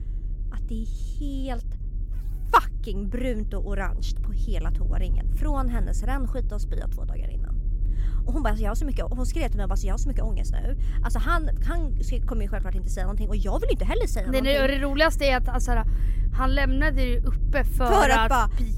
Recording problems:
low rumble; faint; throughout; 25 dB below the speech

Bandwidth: 16 kHz